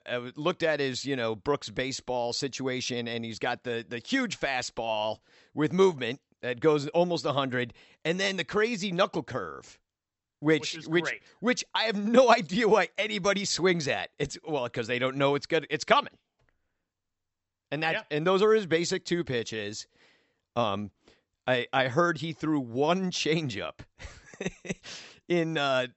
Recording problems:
high frequencies cut off; noticeable; nothing above 8 kHz

